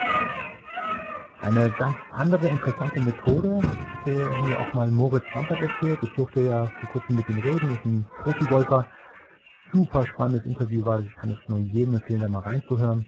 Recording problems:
garbled, watery; badly
animal sounds; loud; throughout; 7 dB below the speech

